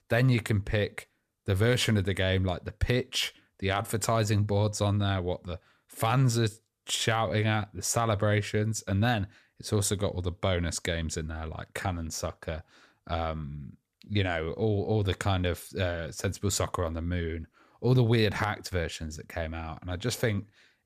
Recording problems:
none

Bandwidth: 14.5 kHz